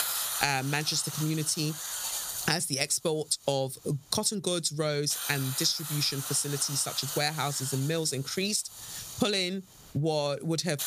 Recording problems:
squashed, flat; somewhat
hiss; loud; throughout; 6 dB below the speech

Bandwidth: 15 kHz